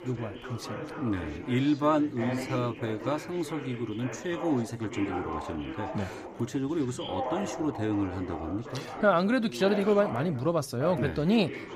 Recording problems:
background chatter; loud; throughout; 3 voices, 9 dB below the speech

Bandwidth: 15.5 kHz